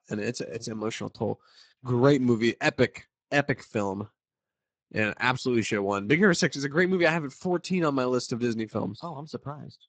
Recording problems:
garbled, watery; badly; nothing above 8 kHz

